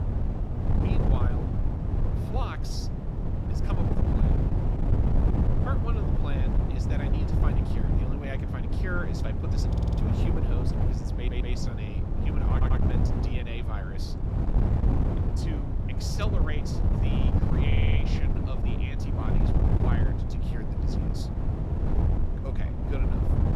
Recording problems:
wind noise on the microphone; heavy; 3 dB above the speech
voice in the background; very faint; throughout; 20 dB below the speech
audio stuttering; 4 times, first at 9.5 s

